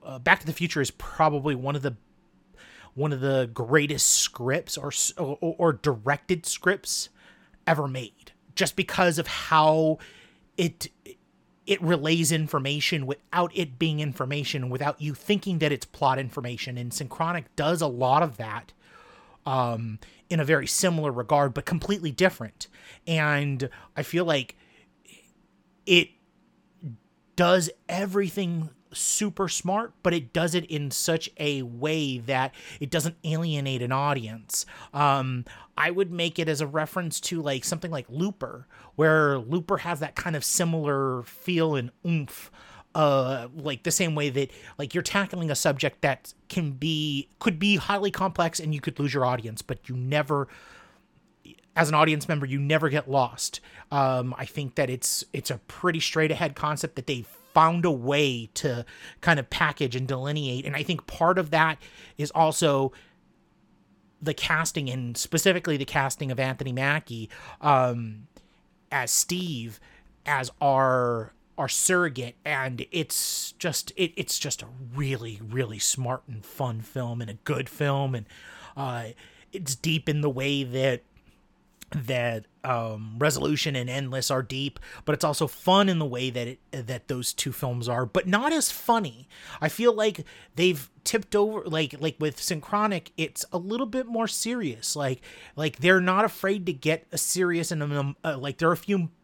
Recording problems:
none

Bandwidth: 17 kHz